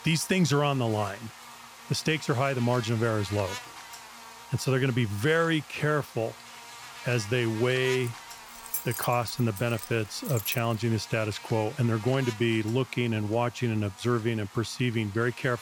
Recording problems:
electrical hum; noticeable; throughout; 50 Hz, 15 dB below the speech
jangling keys; noticeable; from 8 to 11 s; peak 4 dB below the speech

